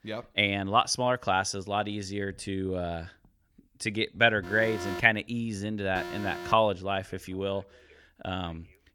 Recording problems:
alarms or sirens; noticeable; from 4.5 s on; 10 dB below the speech

